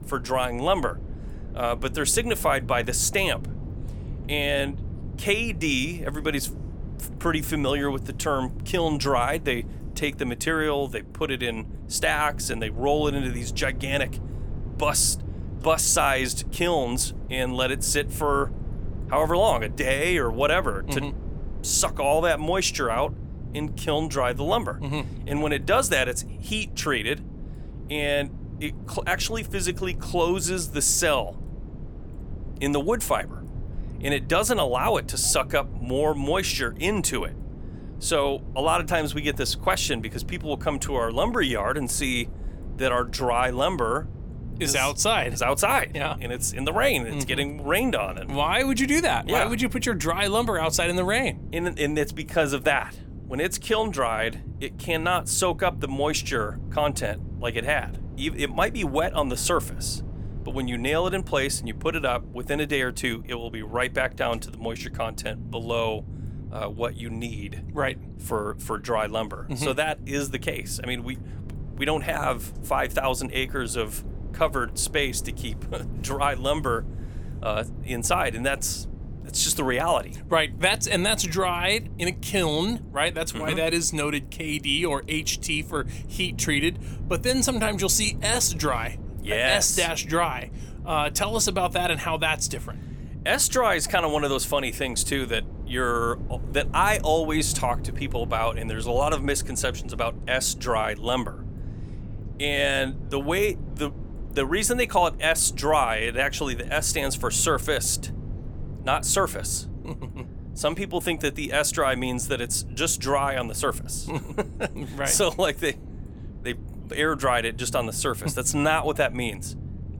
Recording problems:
low rumble; faint; throughout; 20 dB below the speech

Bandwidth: 18.5 kHz